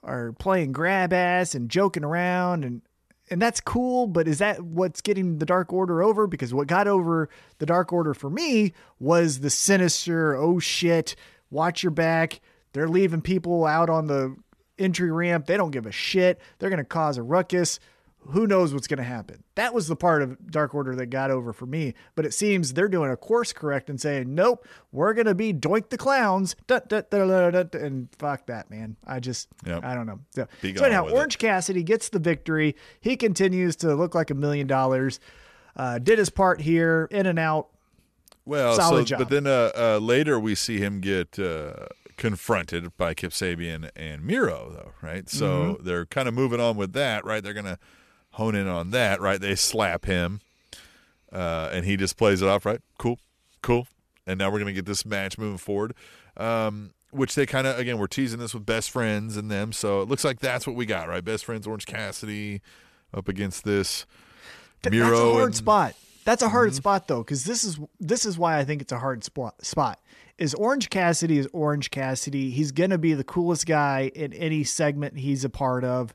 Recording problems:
none

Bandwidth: 13.5 kHz